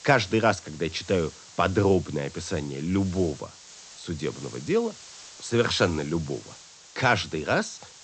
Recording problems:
high frequencies cut off; noticeable; nothing above 8 kHz
hiss; noticeable; throughout; 20 dB below the speech

